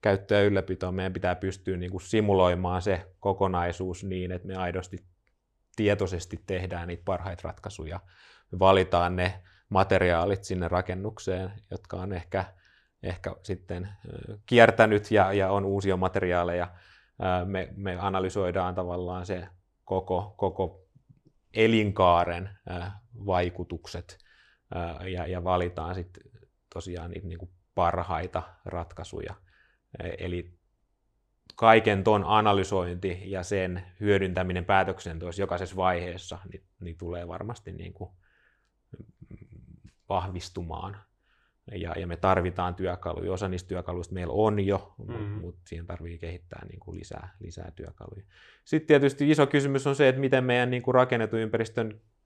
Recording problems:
none

